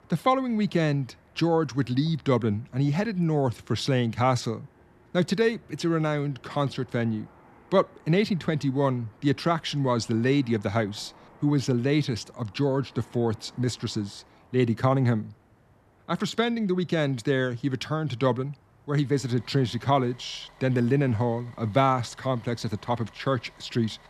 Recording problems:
traffic noise; faint; throughout; 30 dB below the speech

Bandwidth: 13.5 kHz